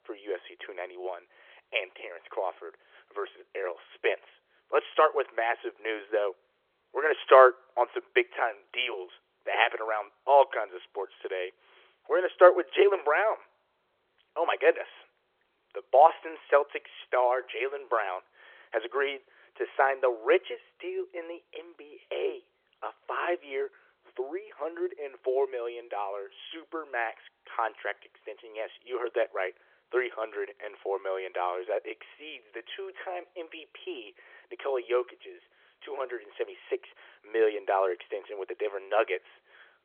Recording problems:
phone-call audio; nothing above 3.5 kHz

